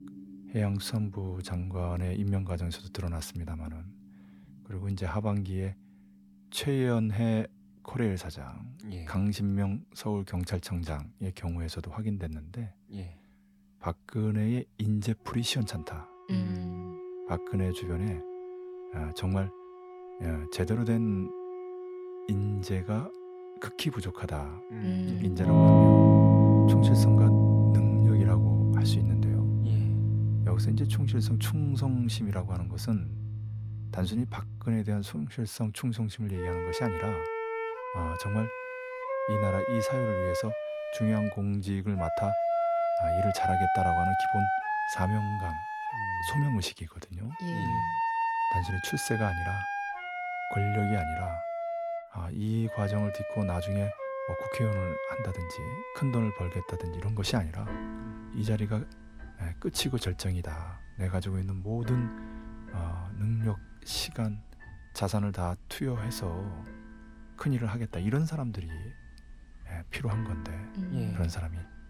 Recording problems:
background music; very loud; throughout; 5 dB above the speech

